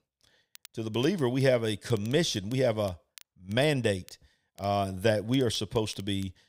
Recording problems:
crackle, like an old record; faint; 25 dB below the speech

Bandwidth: 15.5 kHz